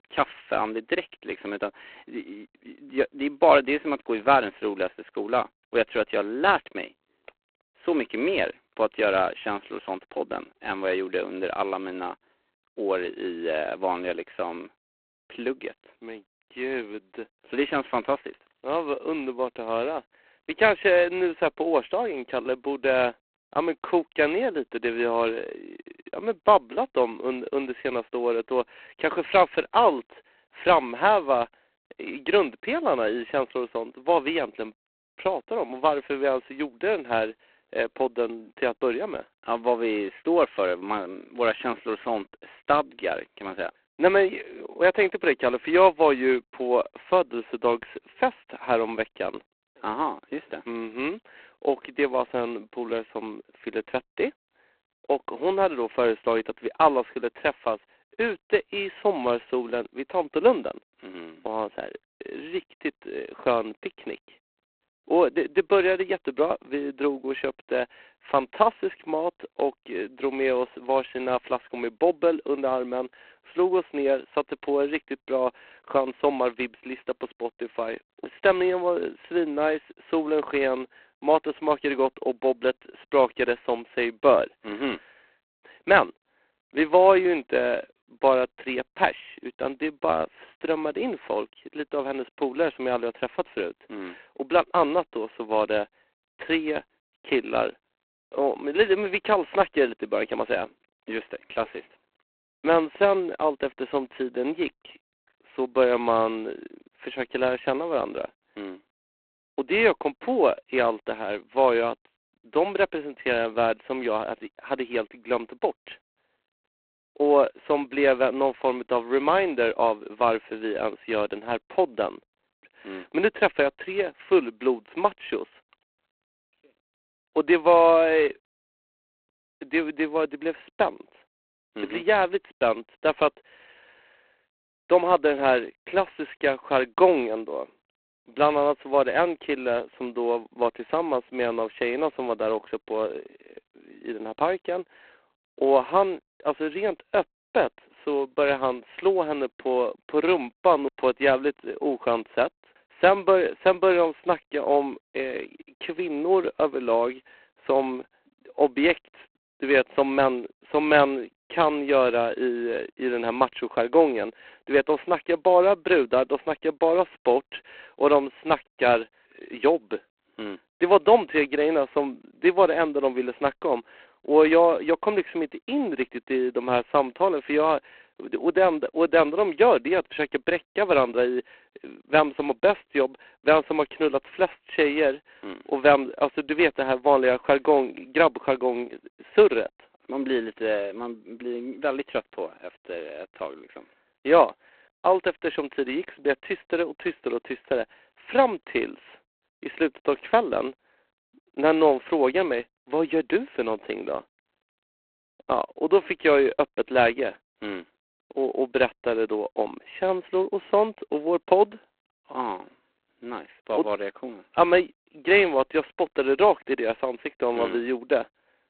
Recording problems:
phone-call audio; poor line; nothing above 4 kHz

